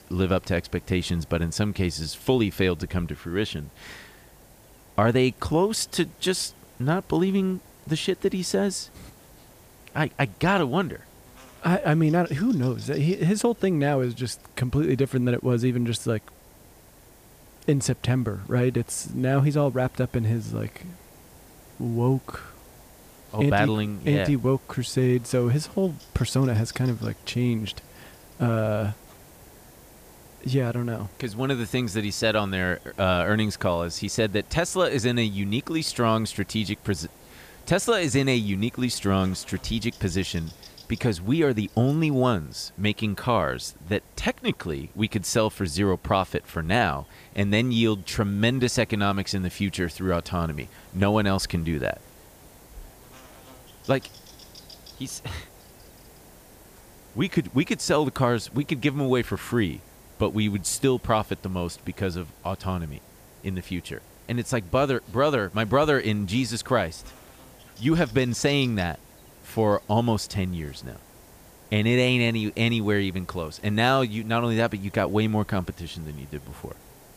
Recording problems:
electrical hum; faint; throughout; 50 Hz, 30 dB below the speech
hiss; faint; throughout; 25 dB below the speech

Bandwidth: 15 kHz